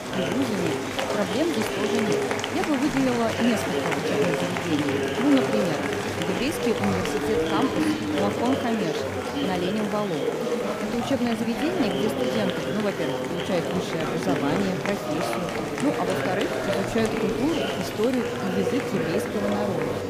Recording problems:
murmuring crowd; very loud; throughout; 1 dB above the speech
hiss; faint; throughout; 30 dB below the speech

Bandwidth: 15 kHz